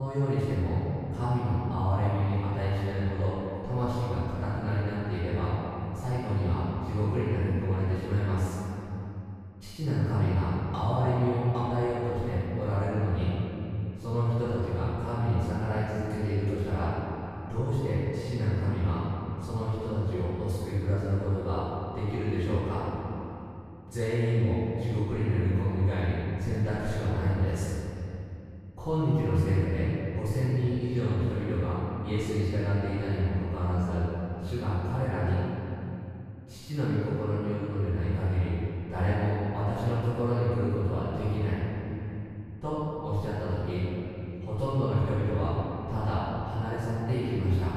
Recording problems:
room echo; strong; dies away in 3 s
off-mic speech; far
abrupt cut into speech; at the start

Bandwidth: 15 kHz